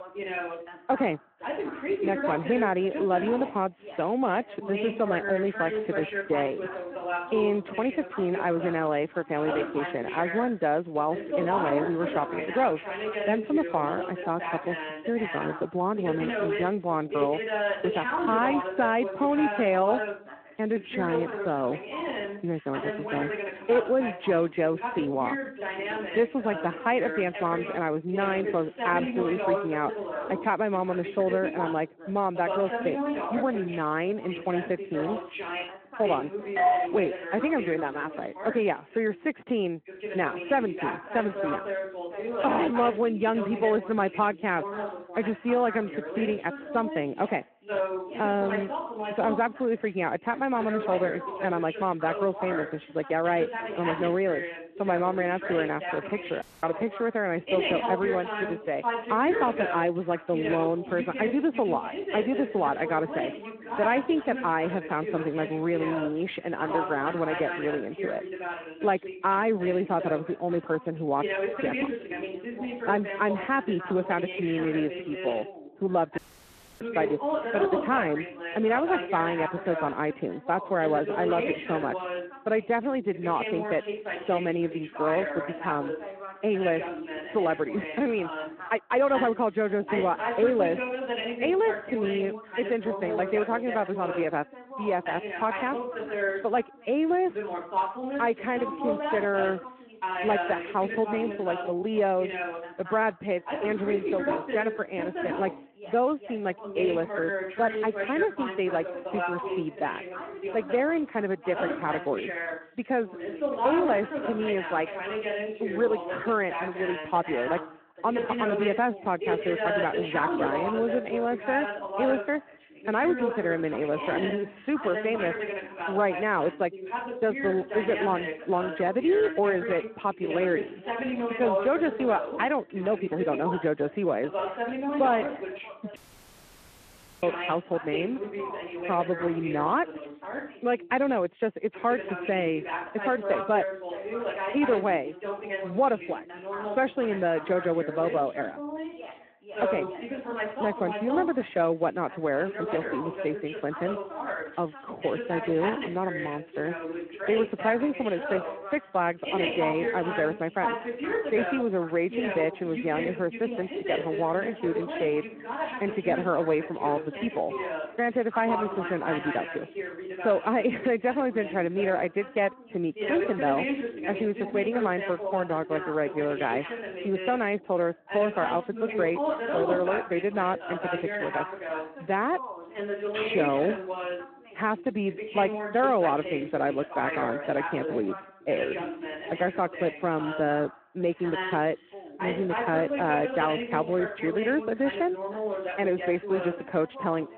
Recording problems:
phone-call audio
background chatter; loud; throughout; 2 voices, 5 dB below the speech
uneven, jittery; strongly; from 6 s to 2:57
doorbell; loud; at 37 s; peak 5 dB above the speech
audio cutting out; at 56 s, at 1:16 for 0.5 s and at 2:16 for 1.5 s

